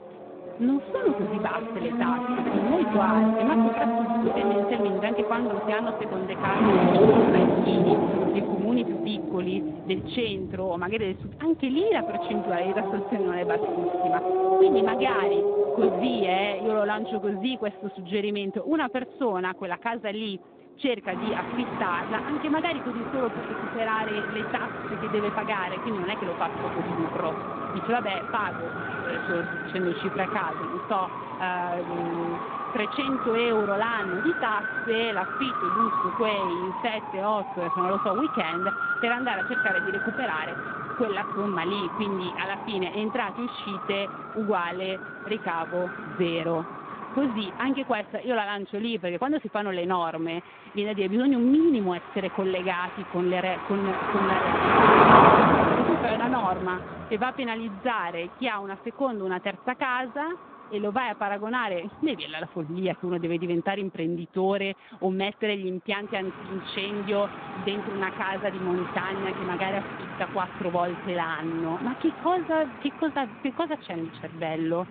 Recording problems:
phone-call audio; nothing above 3.5 kHz
traffic noise; very loud; throughout; 2 dB above the speech

